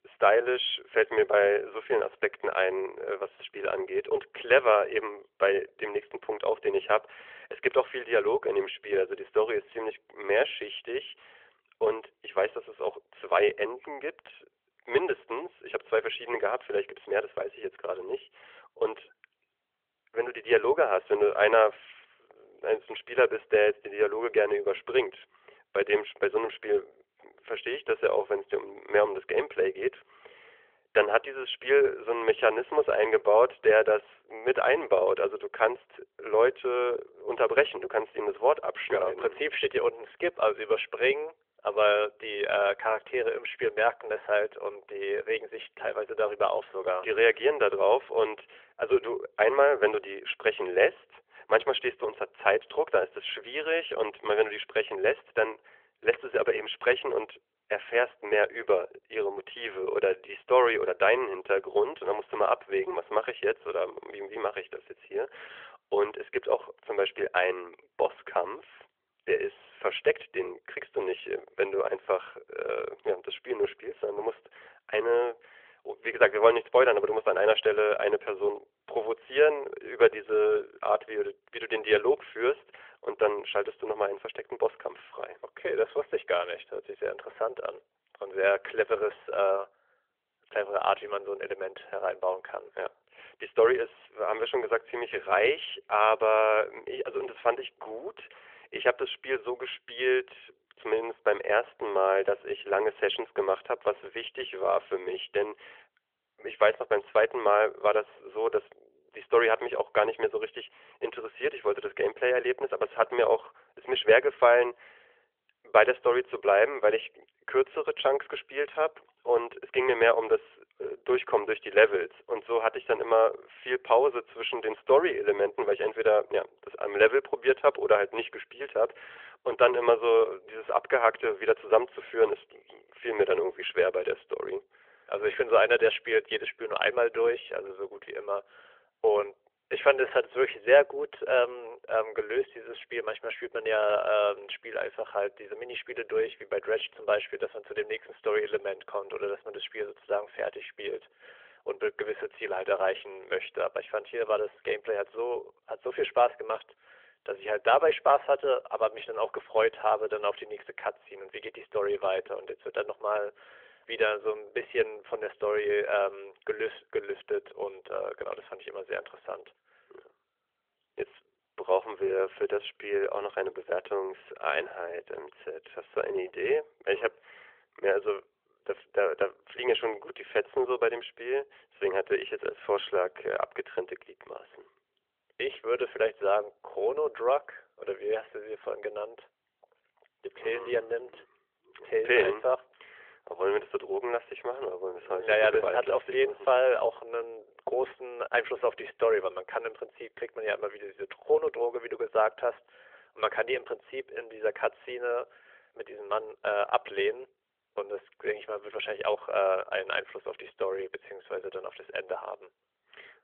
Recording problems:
phone-call audio; nothing above 3.5 kHz

